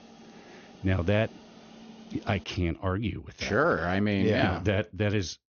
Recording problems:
high frequencies cut off; noticeable; nothing above 6.5 kHz
hiss; faint; until 2.5 s; 20 dB below the speech

